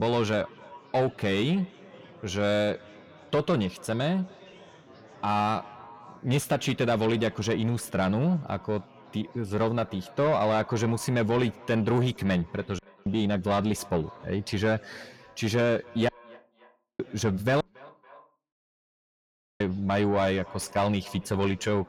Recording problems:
echo of what is said; faint; throughout; 280 ms later, 25 dB below the speech
distortion; slight; 10 dB below the speech
chatter from many people; faint; throughout; 25 dB below the speech
abrupt cut into speech; at the start
audio cutting out; at 13 s, at 16 s for 1 s and at 18 s for 2 s

